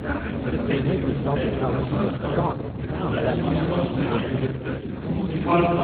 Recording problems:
garbled, watery; badly
chatter from many people; very loud; throughout; 5 dB above the speech
low rumble; noticeable; throughout; 15 dB below the speech

